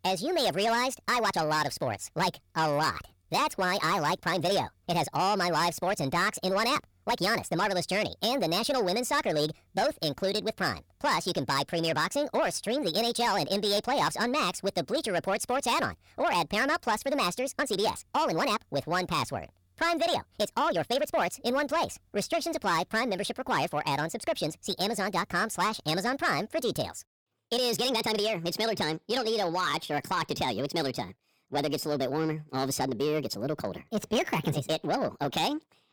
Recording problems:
wrong speed and pitch; too fast and too high; 1.5 times normal speed
distortion; slight; 10 dB below the speech
uneven, jittery; strongly; from 1 to 34 s

